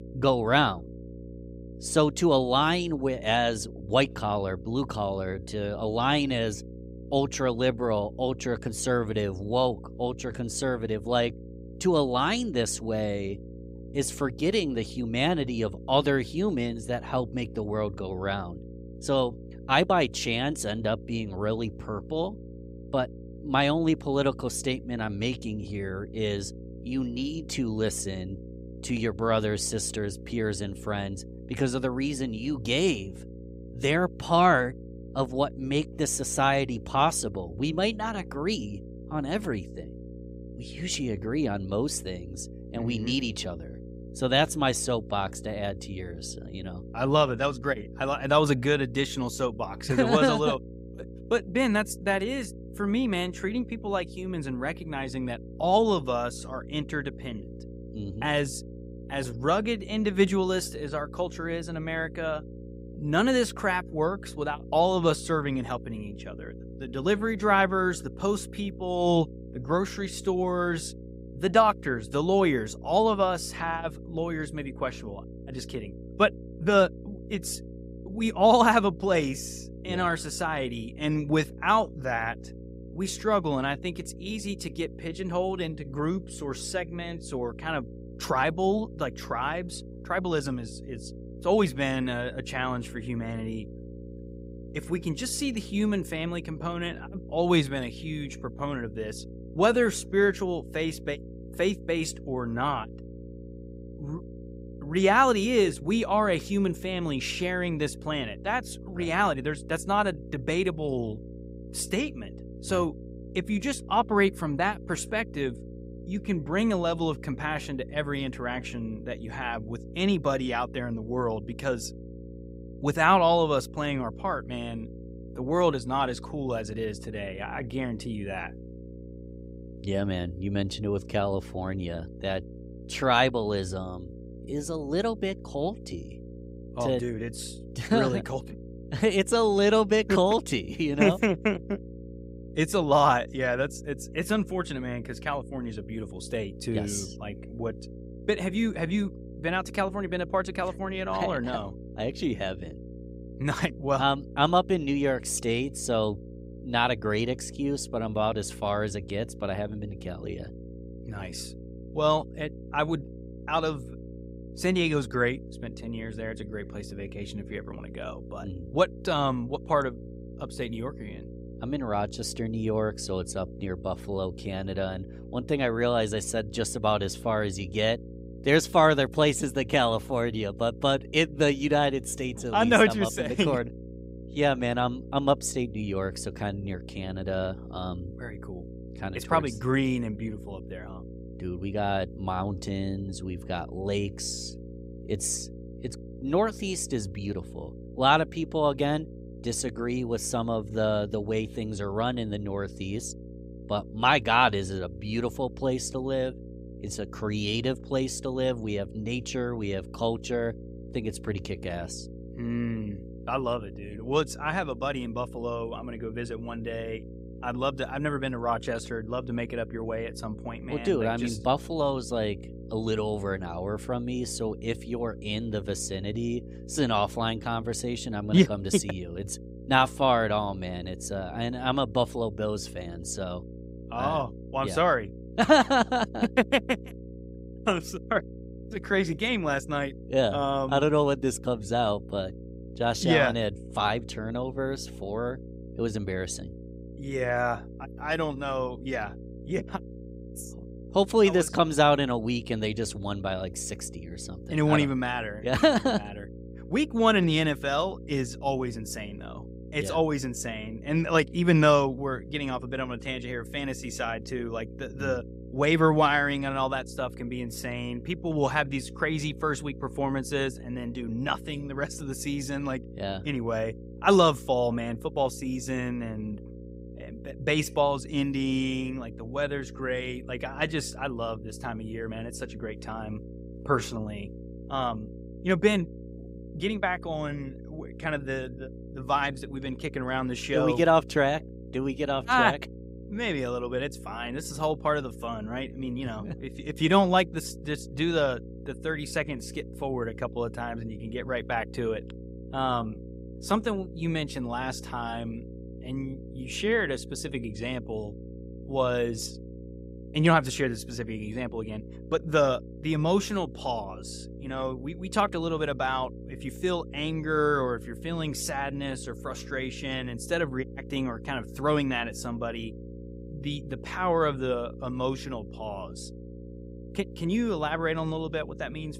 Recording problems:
electrical hum; faint; throughout; 60 Hz, 20 dB below the speech

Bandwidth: 15.5 kHz